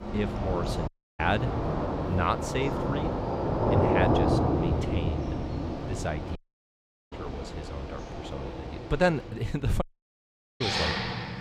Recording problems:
rain or running water; very loud; throughout; 2 dB above the speech
audio cutting out; at 1 s, at 6.5 s for 1 s and at 10 s for 1 s

